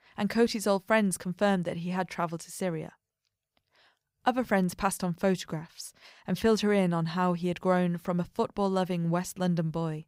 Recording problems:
none

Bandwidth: 15.5 kHz